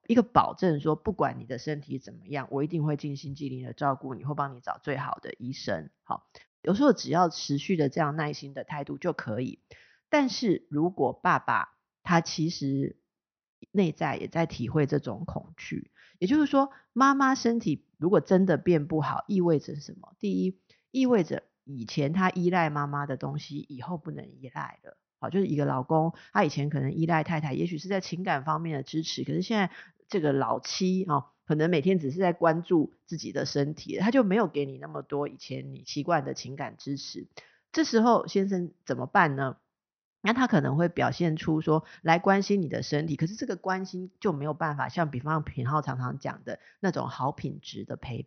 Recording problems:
high frequencies cut off; noticeable; nothing above 6 kHz

